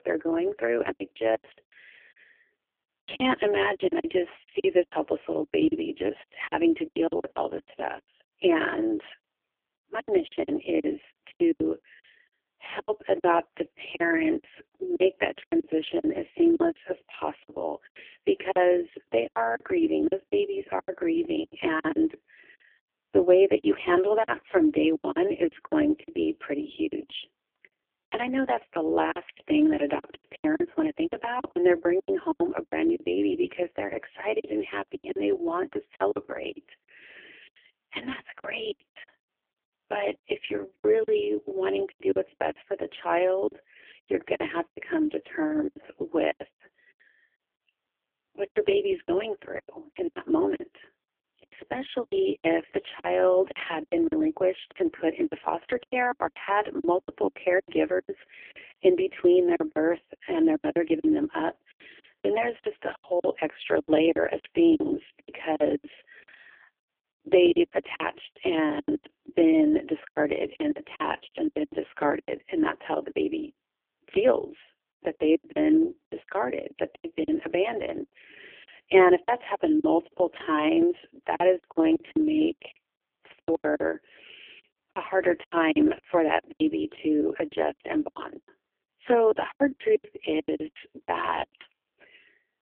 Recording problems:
phone-call audio; poor line; nothing above 3 kHz
choppy; very; 14% of the speech affected

